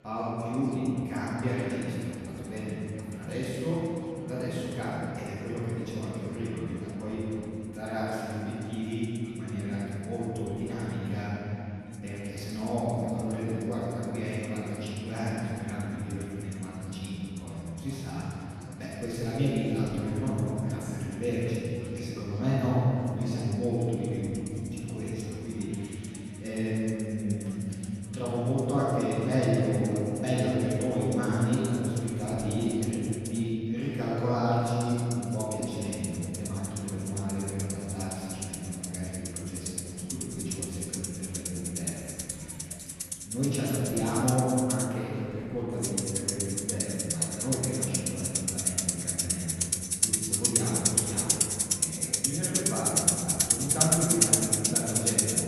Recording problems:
room echo; strong; dies away in 3 s
off-mic speech; far
background music; very loud; throughout; 2 dB above the speech
chatter from many people; faint; throughout; 20 dB below the speech
clattering dishes; faint; from 42 to 44 s; peak 15 dB below the speech

